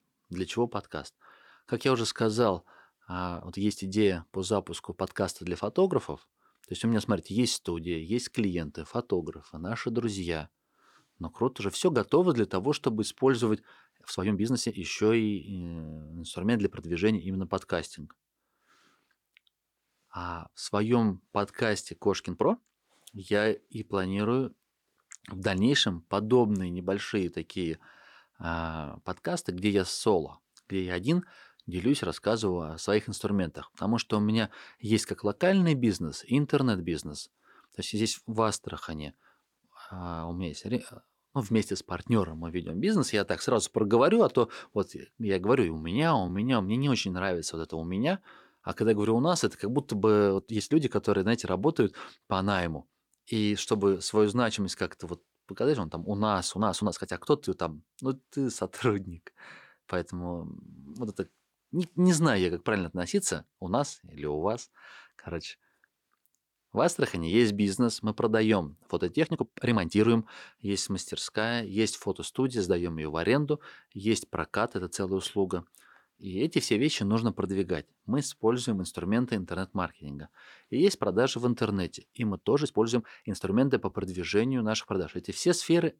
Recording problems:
uneven, jittery; strongly; from 2 s to 1:23

